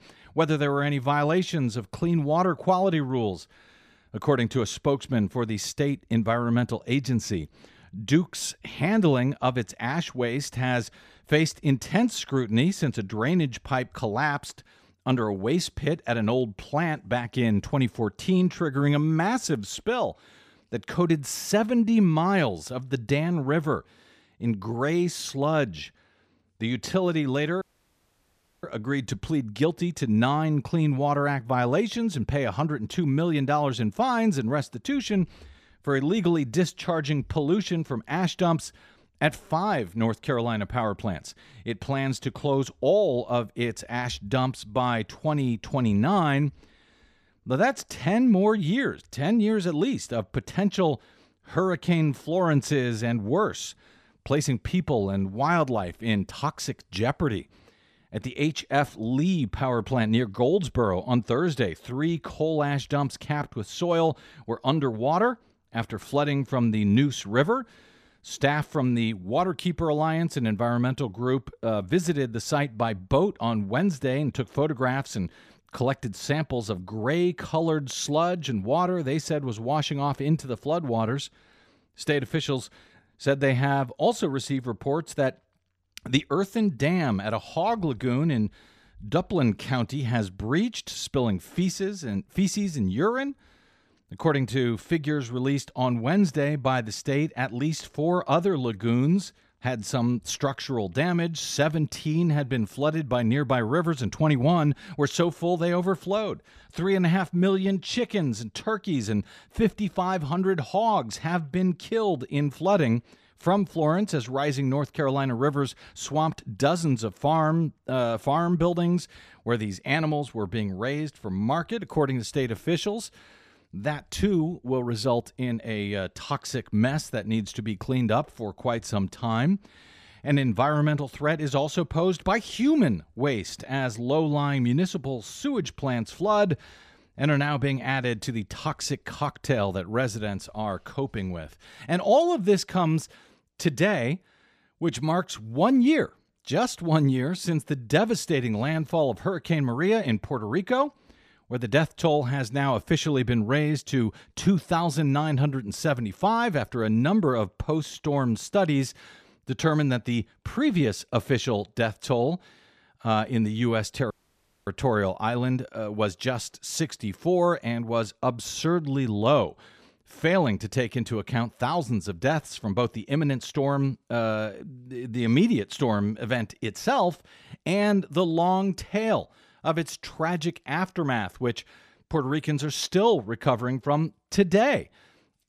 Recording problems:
audio cutting out; at 28 s for 1 s and at 2:44 for 0.5 s

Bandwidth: 14.5 kHz